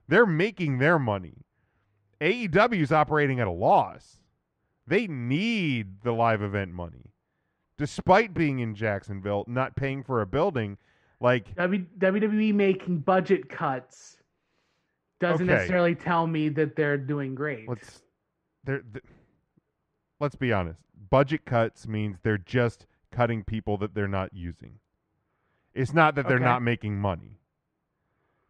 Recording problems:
muffled; very; fading above 3.5 kHz

